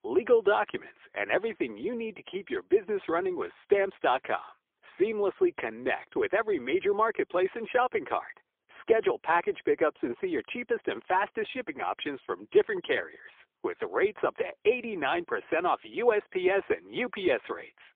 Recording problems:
phone-call audio; poor line; nothing above 3.5 kHz

